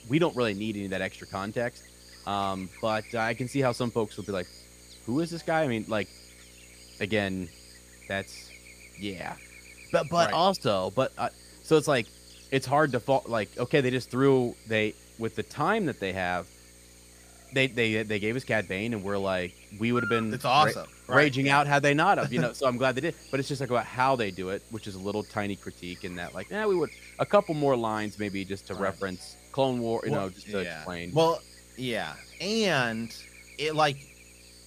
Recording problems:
electrical hum; noticeable; throughout; 60 Hz, 20 dB below the speech

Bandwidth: 15 kHz